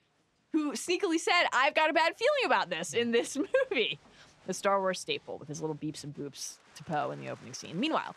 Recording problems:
crowd noise; faint; throughout; 30 dB below the speech

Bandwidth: 13.5 kHz